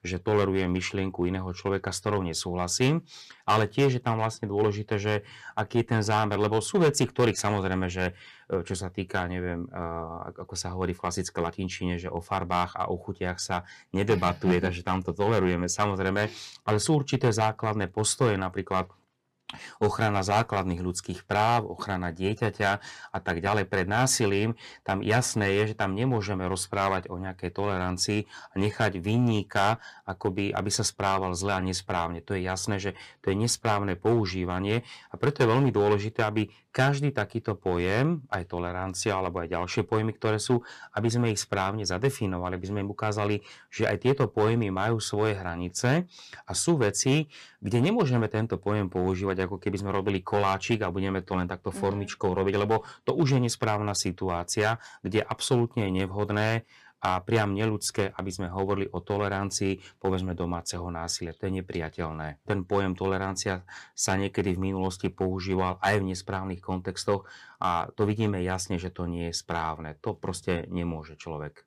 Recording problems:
distortion; slight; 2% of the sound clipped

